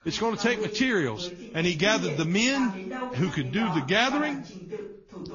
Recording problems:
high frequencies cut off; noticeable; nothing above 7 kHz
garbled, watery; slightly
voice in the background; noticeable; throughout; 10 dB below the speech

